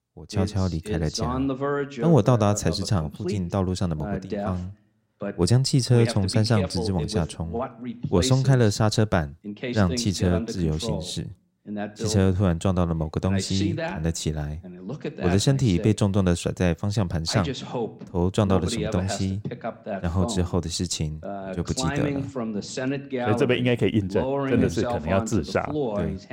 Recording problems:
voice in the background; loud; throughout; 7 dB below the speech

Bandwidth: 16 kHz